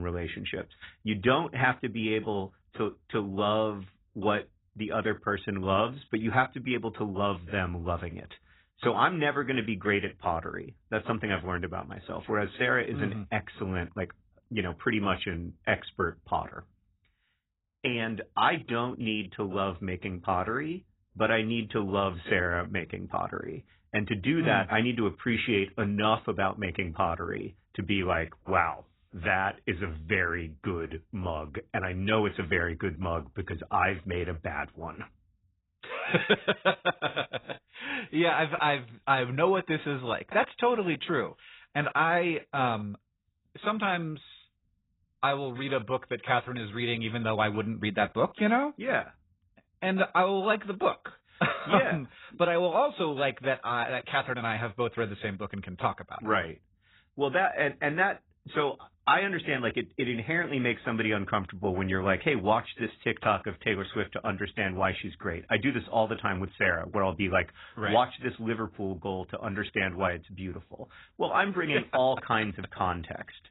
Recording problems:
garbled, watery; badly; nothing above 4 kHz
abrupt cut into speech; at the start

